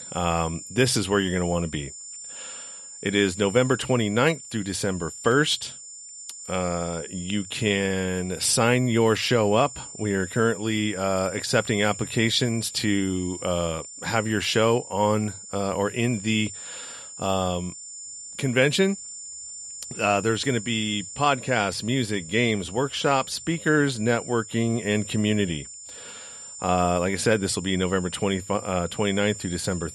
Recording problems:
high-pitched whine; noticeable; throughout; 7 kHz, 15 dB below the speech

